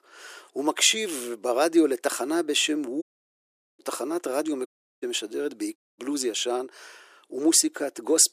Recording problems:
thin; very; fading below 350 Hz
audio cutting out; at 3 s for 1 s, at 4.5 s and at 6 s

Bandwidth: 14.5 kHz